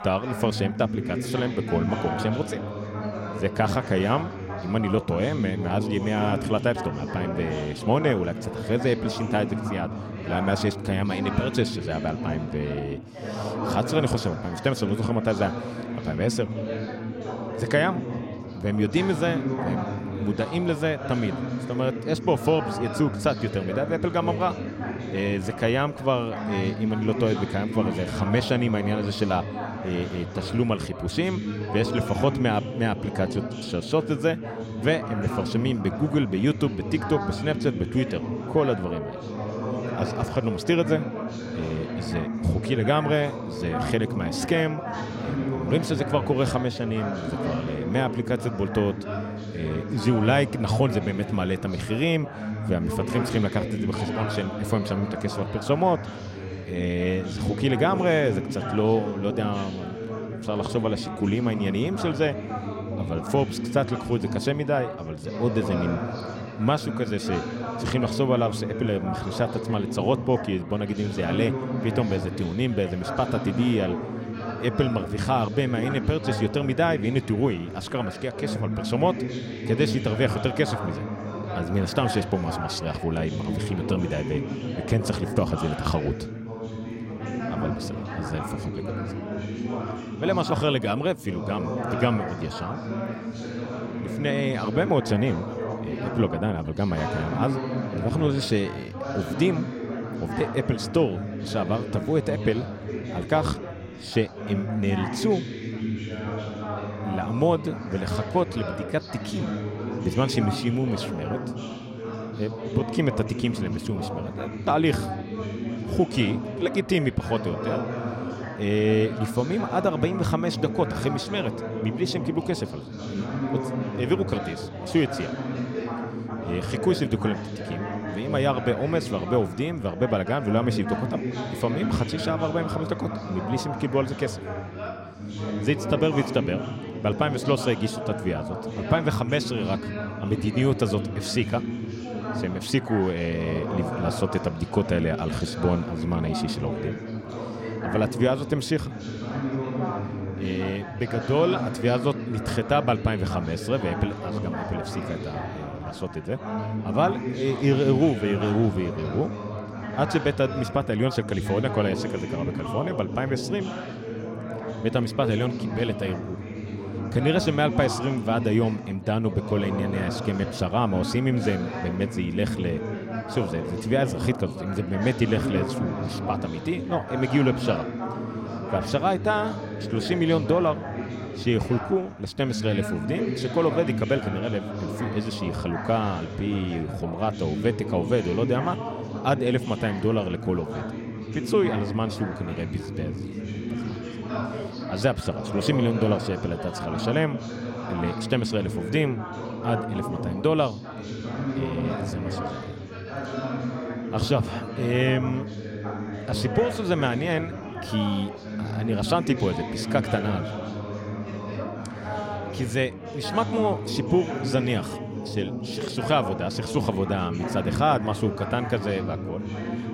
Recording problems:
background chatter; loud; throughout; 4 voices, 5 dB below the speech

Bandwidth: 16 kHz